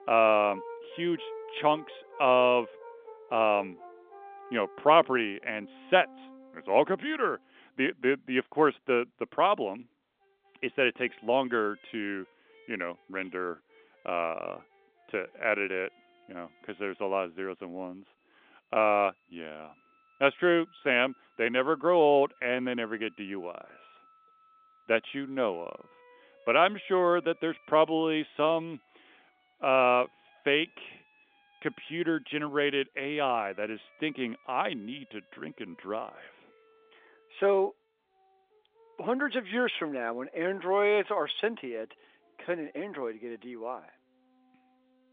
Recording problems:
phone-call audio; nothing above 3.5 kHz
background music; faint; throughout; 25 dB below the speech

